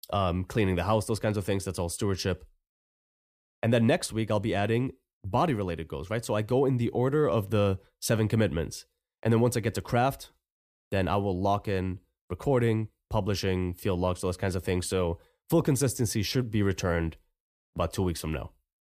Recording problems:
none

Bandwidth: 15 kHz